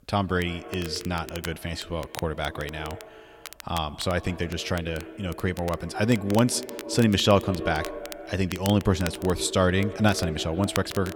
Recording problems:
echo of what is said; noticeable; throughout; 150 ms later, 15 dB below the speech
crackle, like an old record; noticeable; 15 dB below the speech

